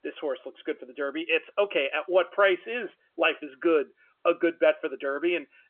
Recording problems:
phone-call audio; nothing above 3 kHz

